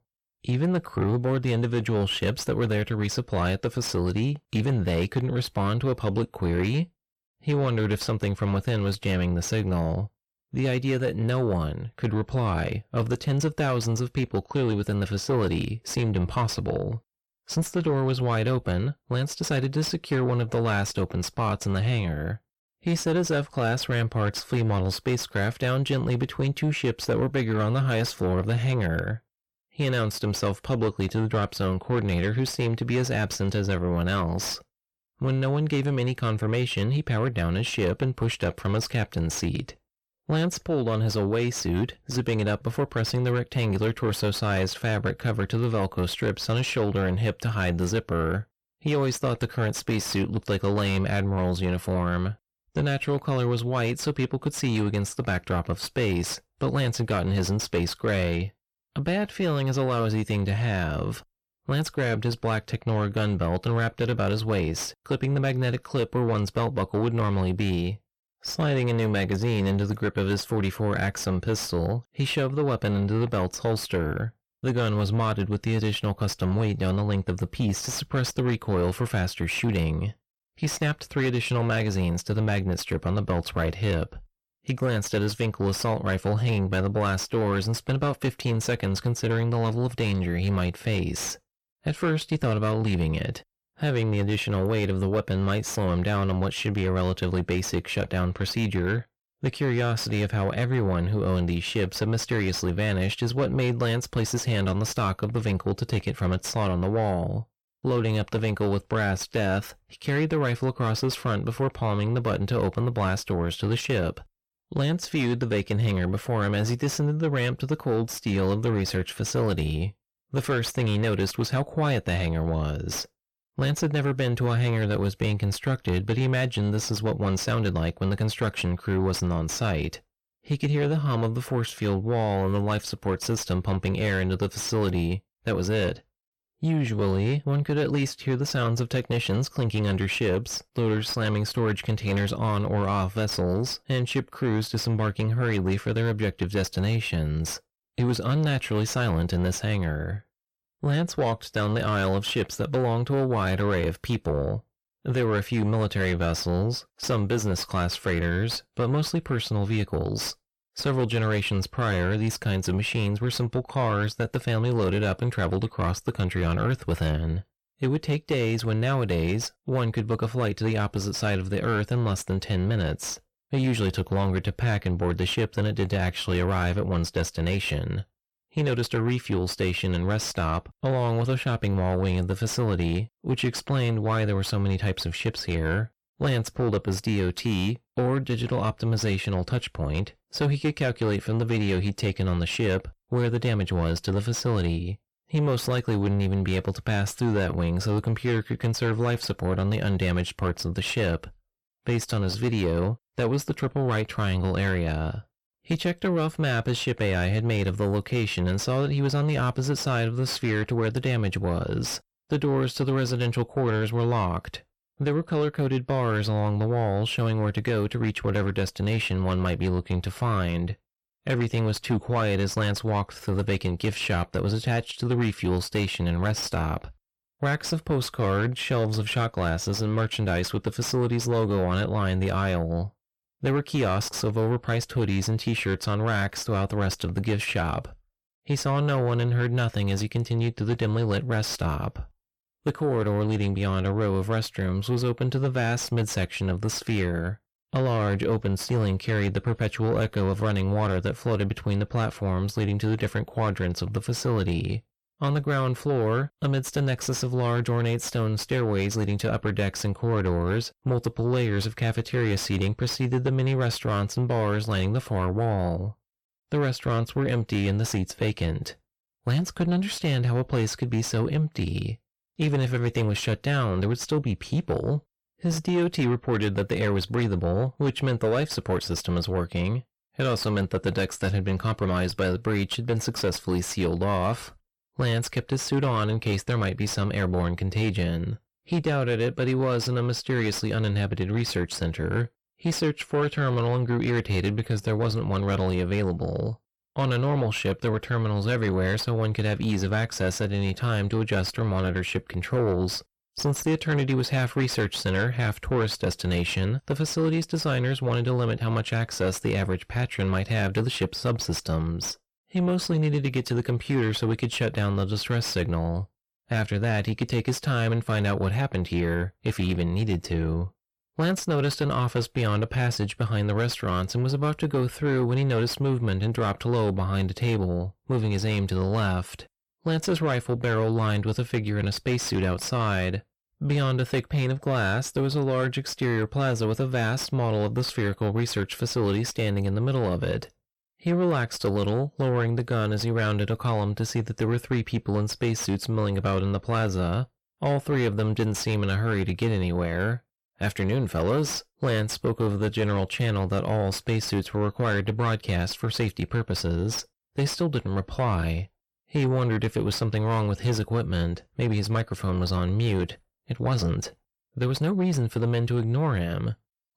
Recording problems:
distortion; slight; 10 dB below the speech

